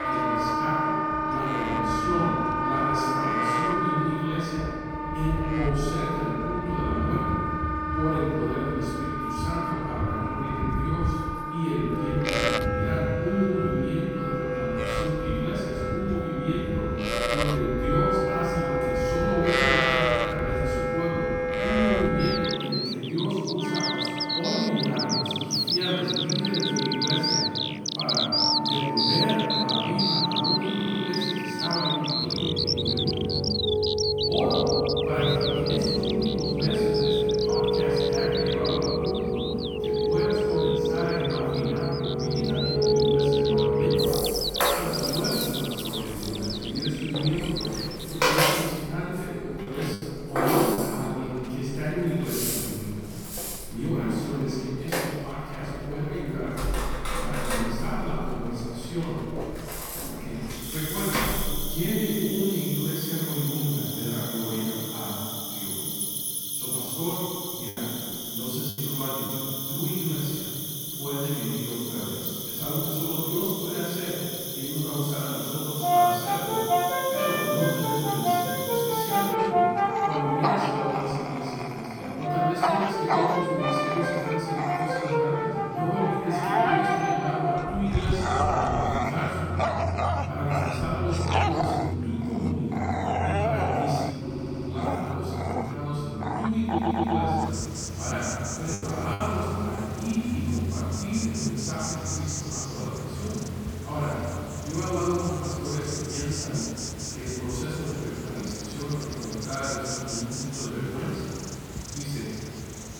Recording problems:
room echo; strong; dies away in 2.5 s
off-mic speech; far
animal sounds; very loud; throughout; as loud as the speech
background music; very loud; throughout; 1 dB above the speech
audio stuttering; at 31 s, at 1:34 and at 1:37
choppy; very; from 48 to 51 s, from 1:07 to 1:09 and from 1:39 to 1:40; 7% of the speech affected

